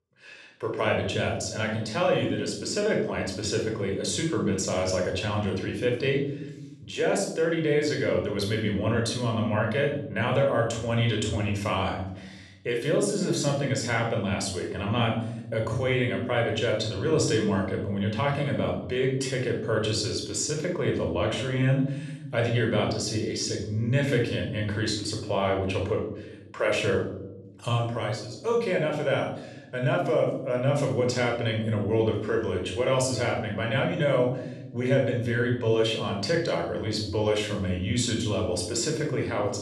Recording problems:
room echo; noticeable; dies away in 0.9 s
off-mic speech; somewhat distant

